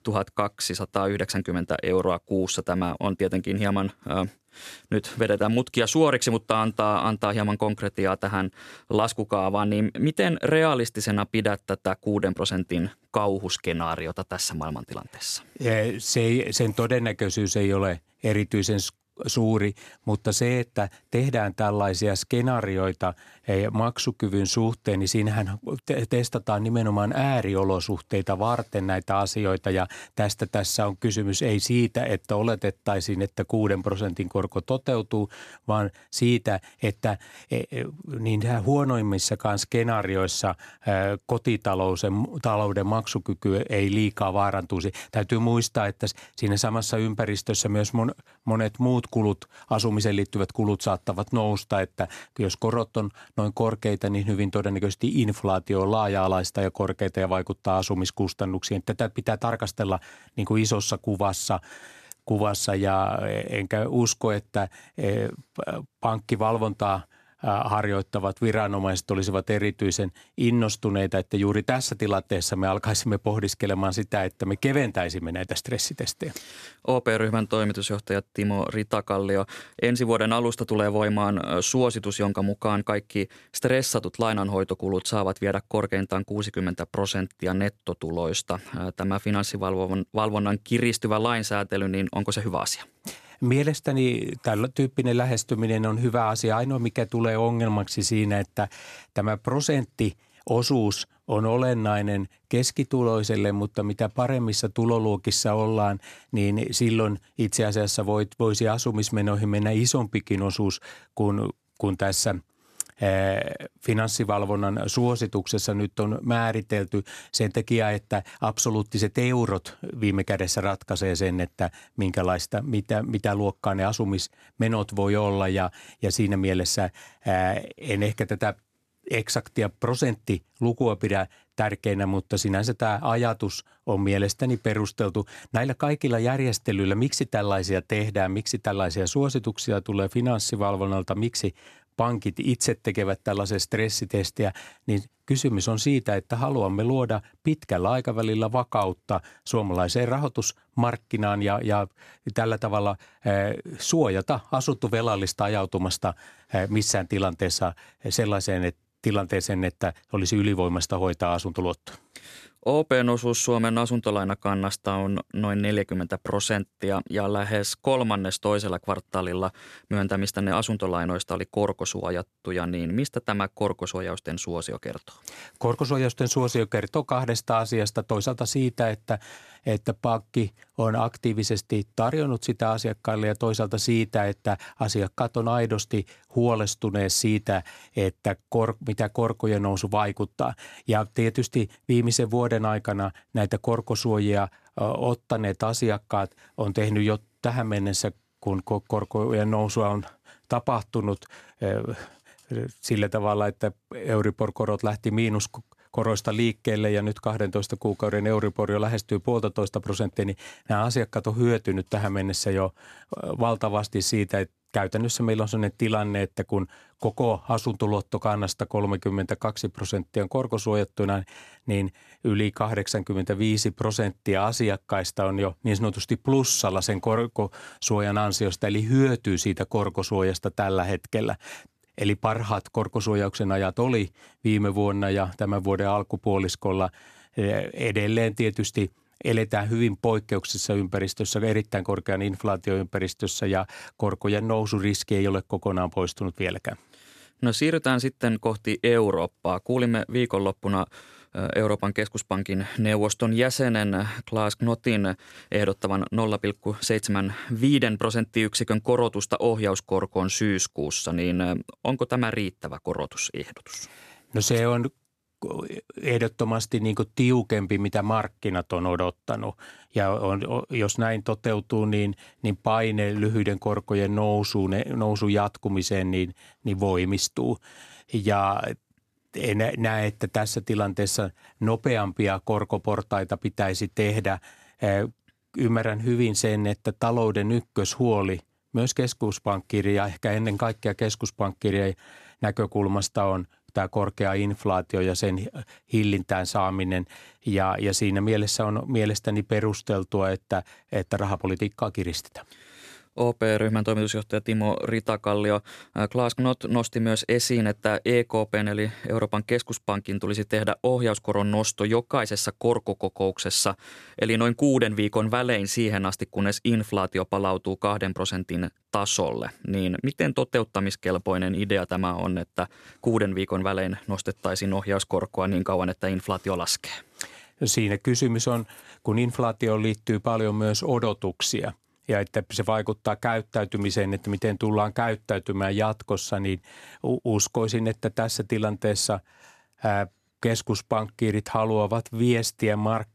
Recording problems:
none

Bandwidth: 14.5 kHz